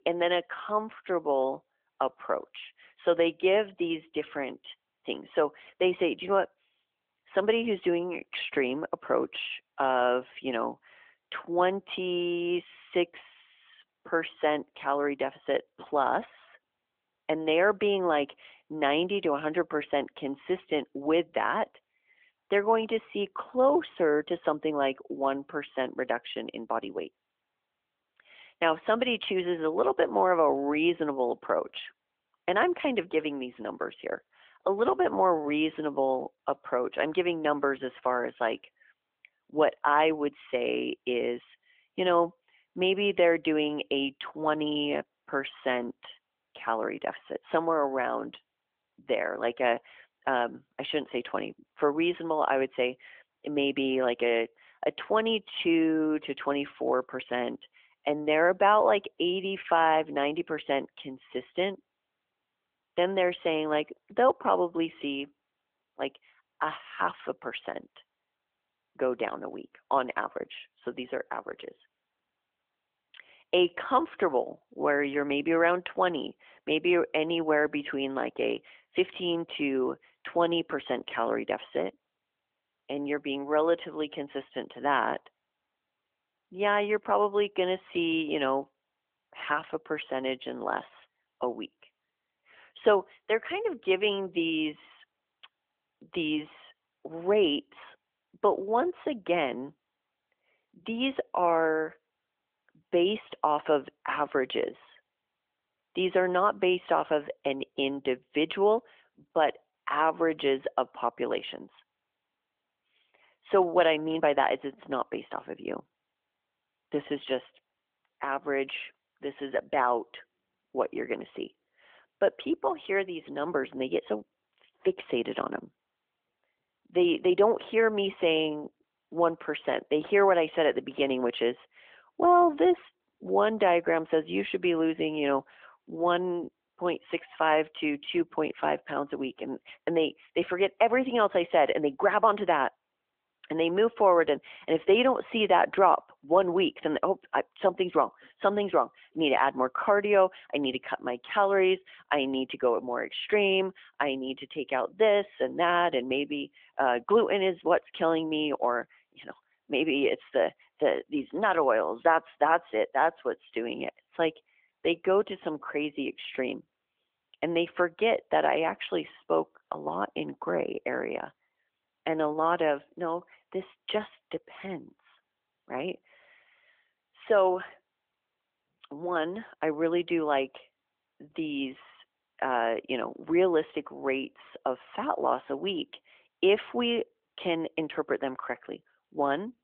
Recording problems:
phone-call audio; nothing above 3.5 kHz

